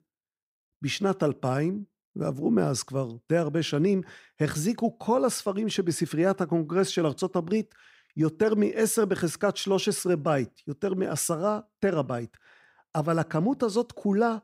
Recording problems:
none

